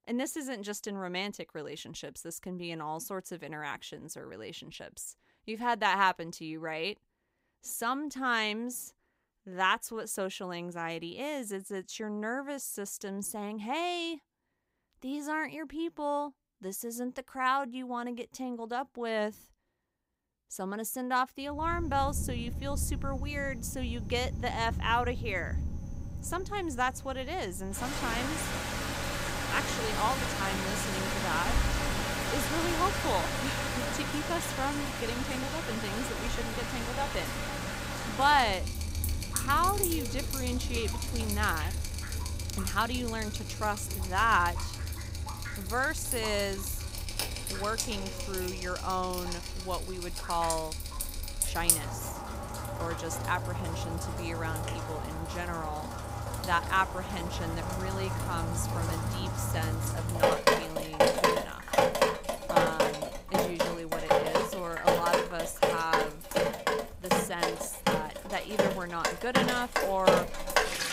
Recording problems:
rain or running water; very loud; from 22 s on; 2 dB above the speech

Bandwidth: 15.5 kHz